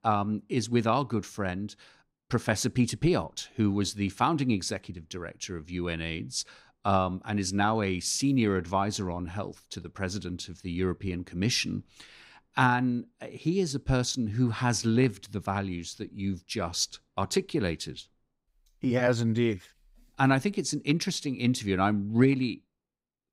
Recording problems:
none

